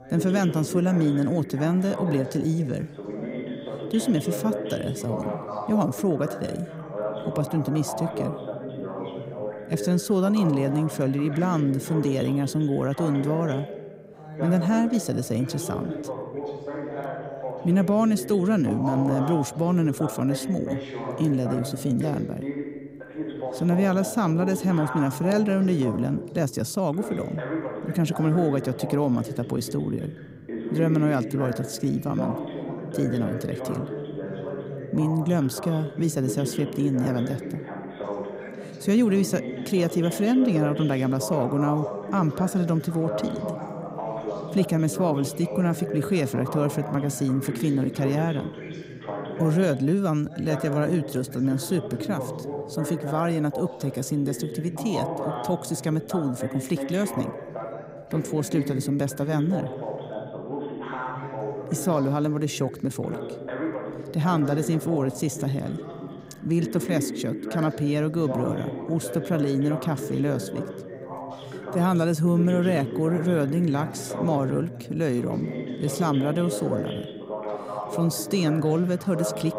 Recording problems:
background chatter; loud; throughout; 2 voices, 8 dB below the speech

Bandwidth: 15.5 kHz